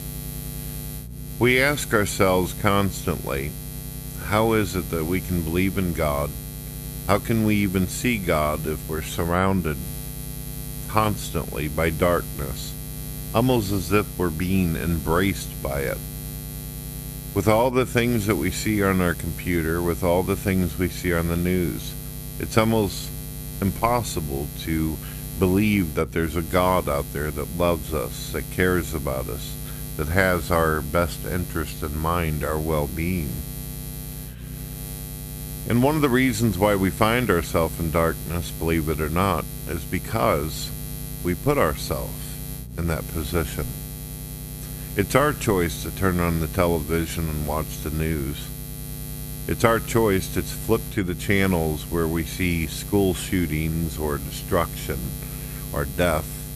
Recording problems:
electrical hum; noticeable; throughout; 60 Hz, 15 dB below the speech

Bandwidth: 14.5 kHz